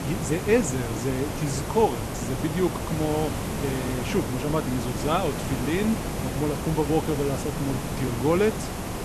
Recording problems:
hiss; loud; throughout; 4 dB below the speech

